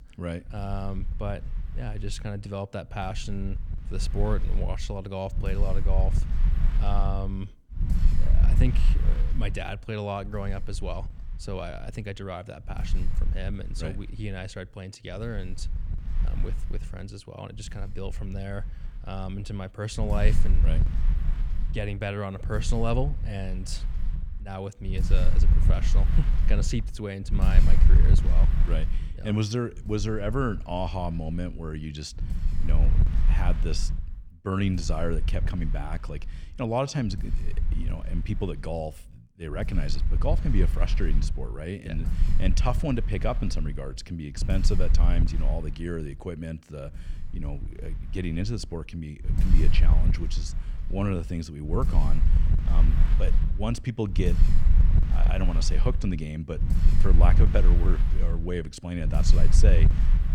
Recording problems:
wind noise on the microphone; heavy; 9 dB below the speech

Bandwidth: 17.5 kHz